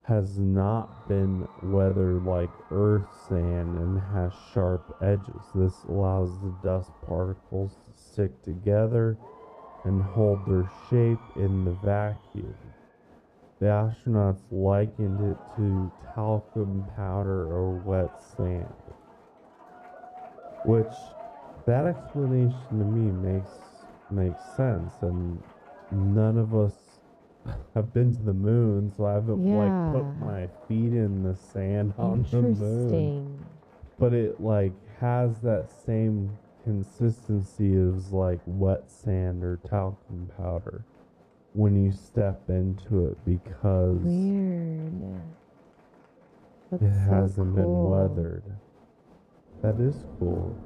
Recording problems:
muffled; very; fading above 1 kHz
wrong speed, natural pitch; too slow; 0.6 times normal speed
crowd noise; faint; throughout; 25 dB below the speech
uneven, jittery; strongly; from 2.5 to 30 s

